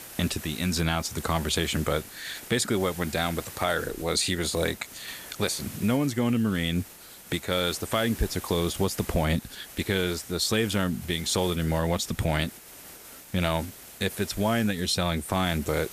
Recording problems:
hiss; noticeable; throughout; 15 dB below the speech

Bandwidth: 14.5 kHz